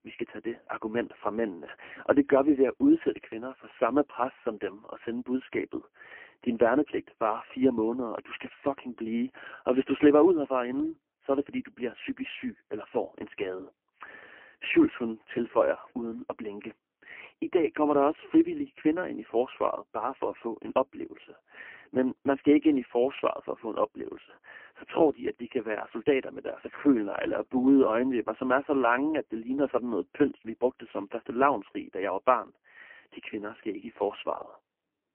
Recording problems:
phone-call audio; poor line; nothing above 3 kHz

